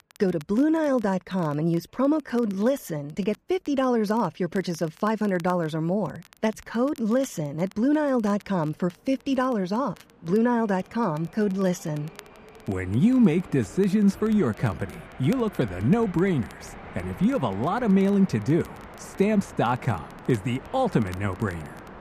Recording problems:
muffled; slightly; fading above 3 kHz
train or aircraft noise; noticeable; throughout; 20 dB below the speech
crackle, like an old record; faint; 30 dB below the speech

